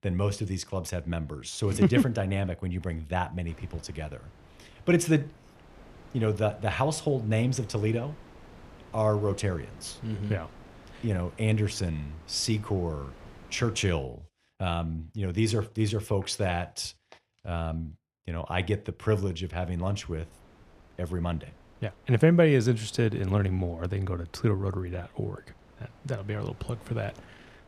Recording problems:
wind noise on the microphone; occasional gusts; from 3.5 to 14 s and from 20 s on; 20 dB below the speech

